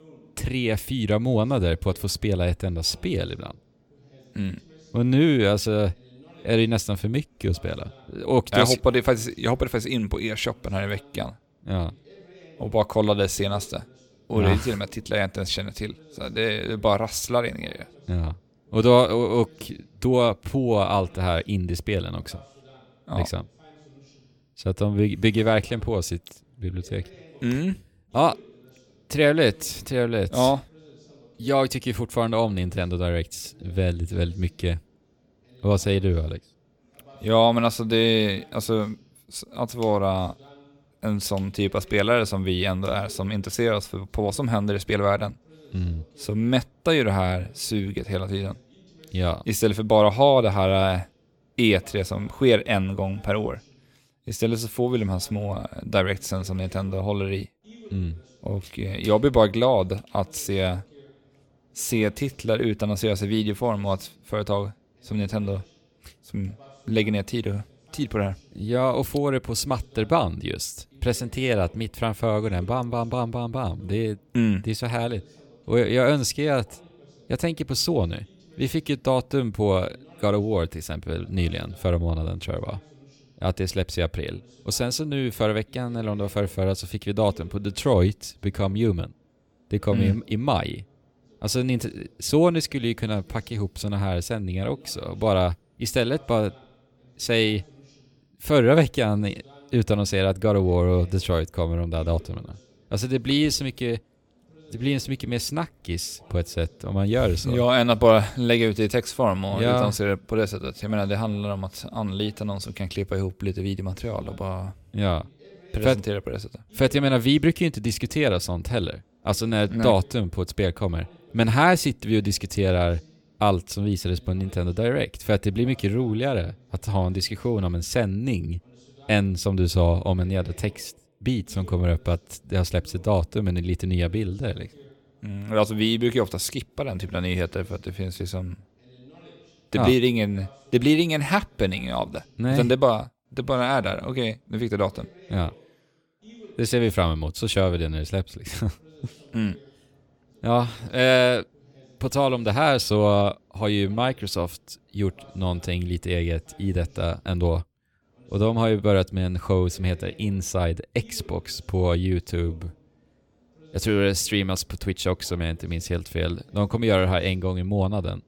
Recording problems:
voice in the background; faint; throughout; 30 dB below the speech

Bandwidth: 17.5 kHz